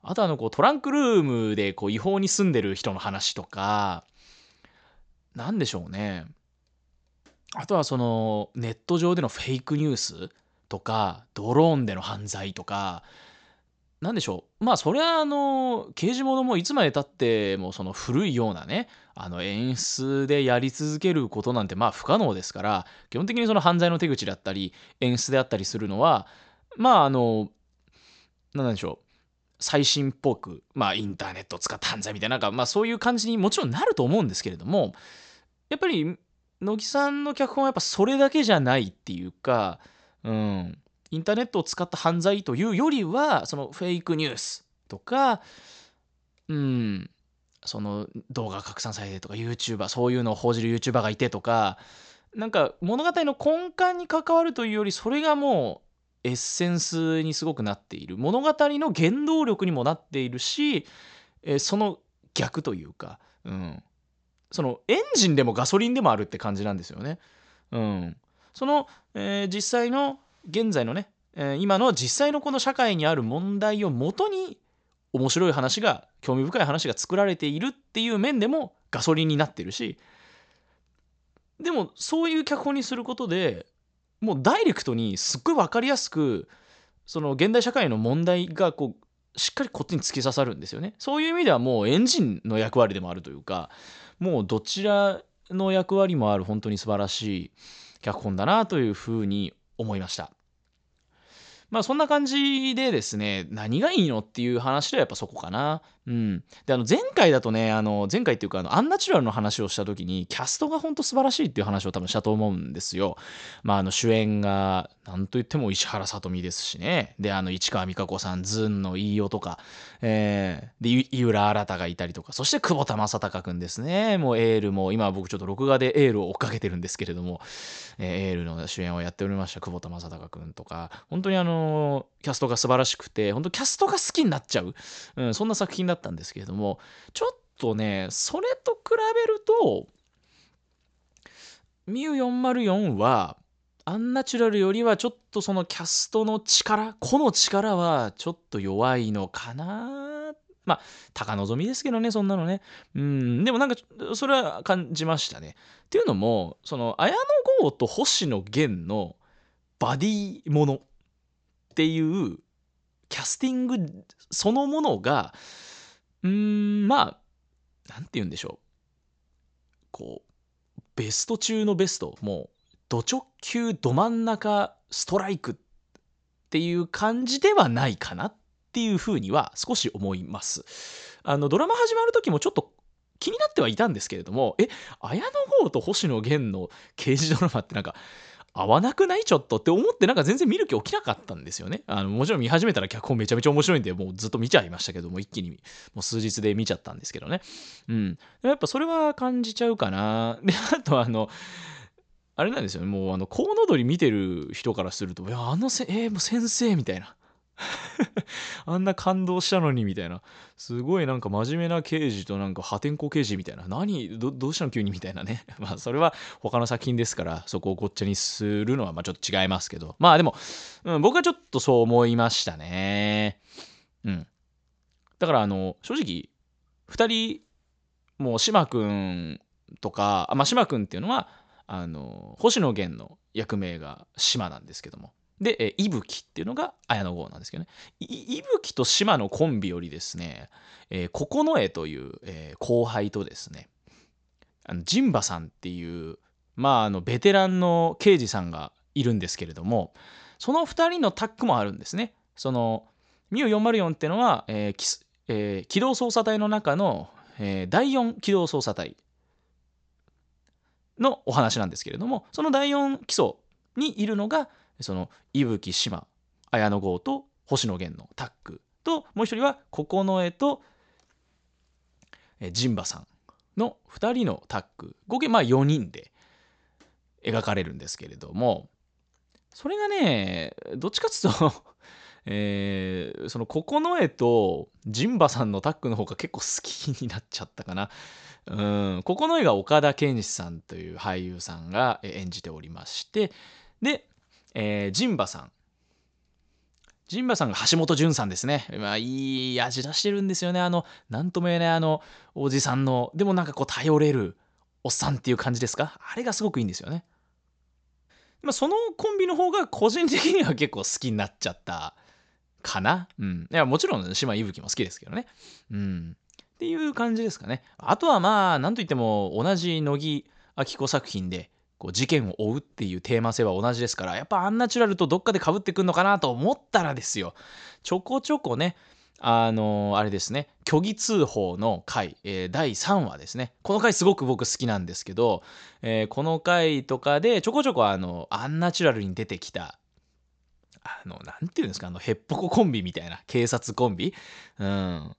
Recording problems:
high frequencies cut off; noticeable; nothing above 8 kHz

